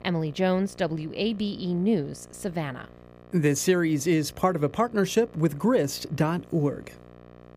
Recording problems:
electrical hum; faint; throughout; 60 Hz, 25 dB below the speech

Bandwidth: 15 kHz